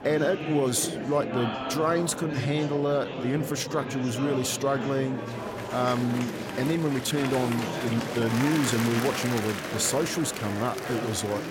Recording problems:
murmuring crowd; loud; throughout; 5 dB below the speech
uneven, jittery; strongly; from 3 to 8.5 s

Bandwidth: 16.5 kHz